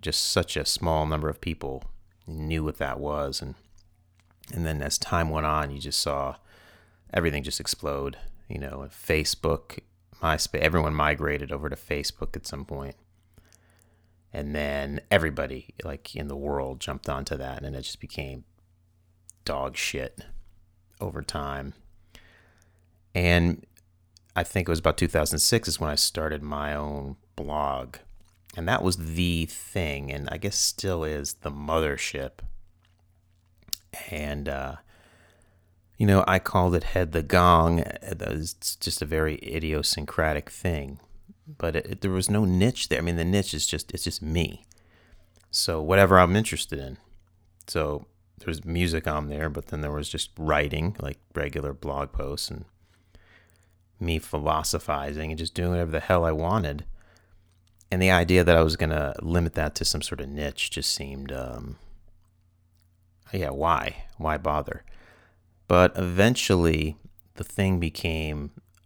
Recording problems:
none

